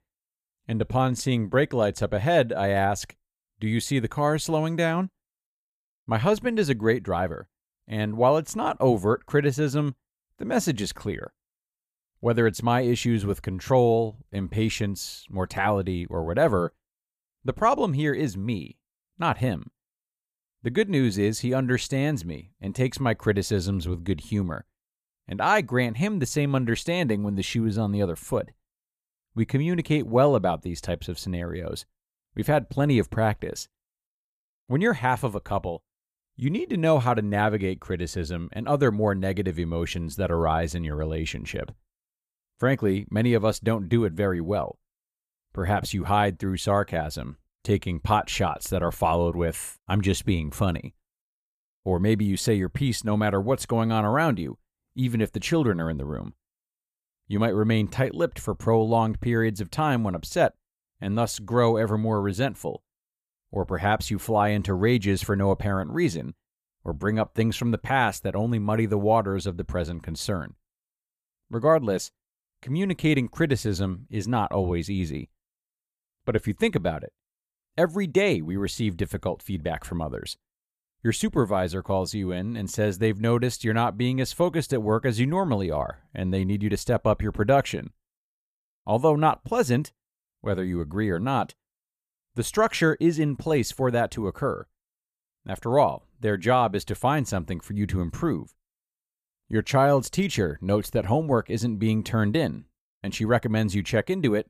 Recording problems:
none

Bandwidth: 14.5 kHz